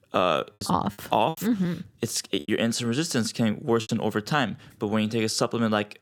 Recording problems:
choppy; very; from 0.5 to 2.5 s and at 4 s; 9% of the speech affected

